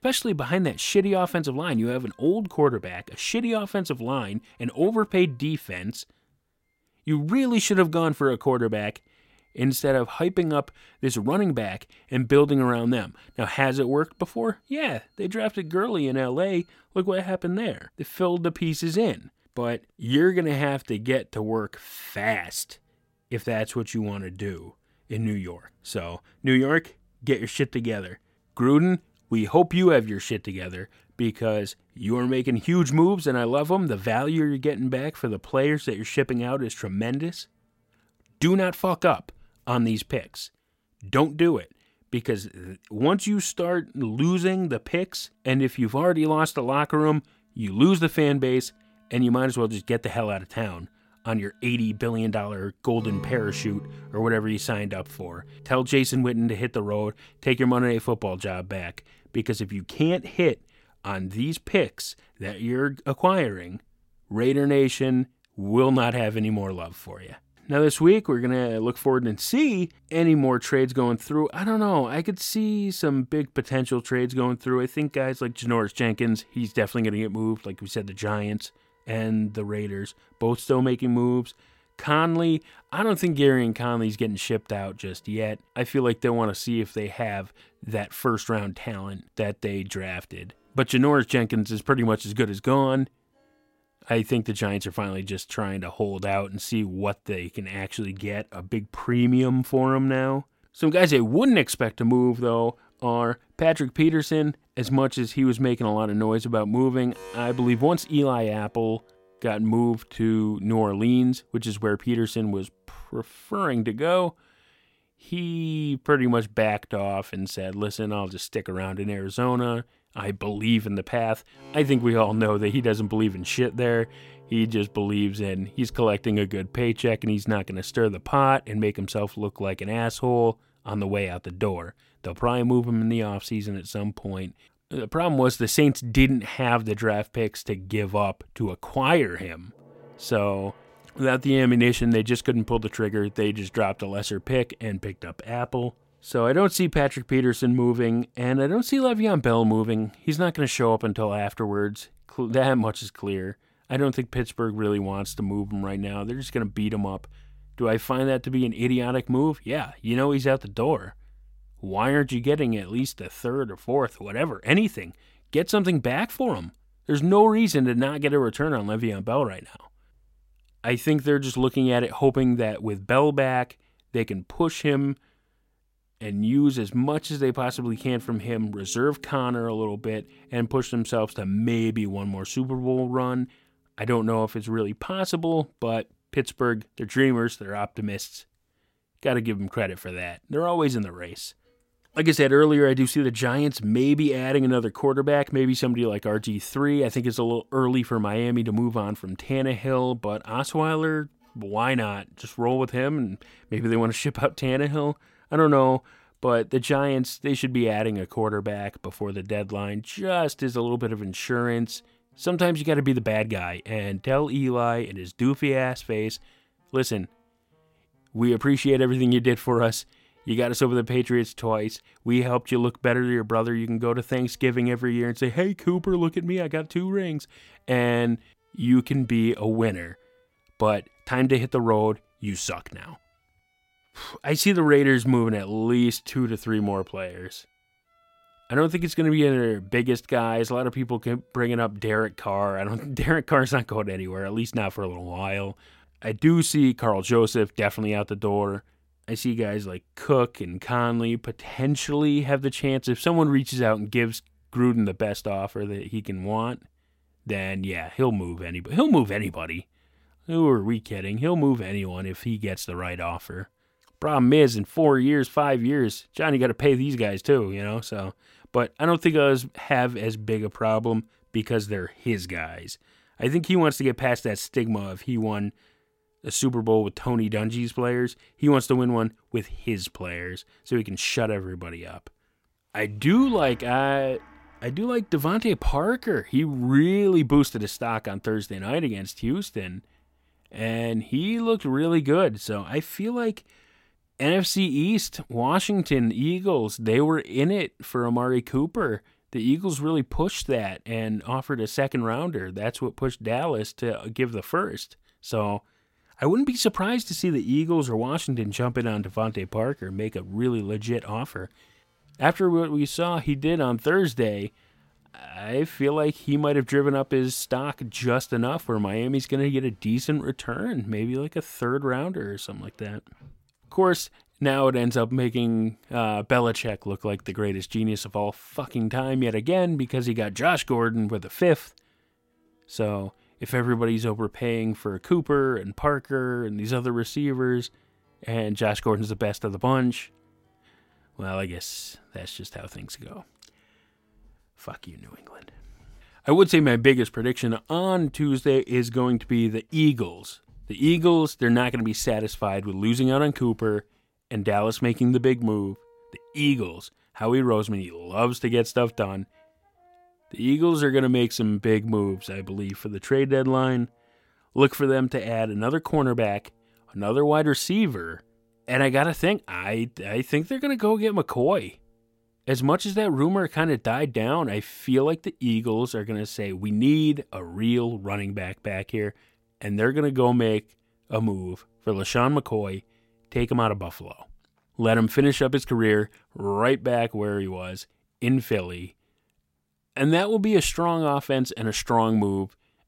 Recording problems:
background music; faint; throughout; 30 dB below the speech

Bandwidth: 16.5 kHz